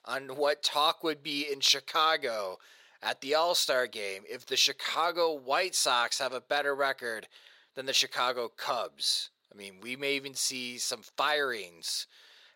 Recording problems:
thin; somewhat; fading below 500 Hz

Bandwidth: 16 kHz